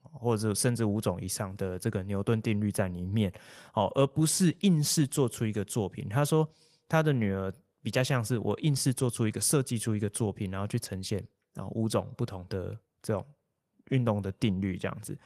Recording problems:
garbled, watery; slightly

